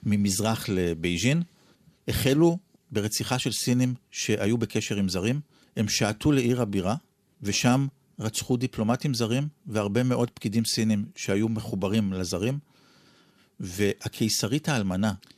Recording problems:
none

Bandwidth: 14.5 kHz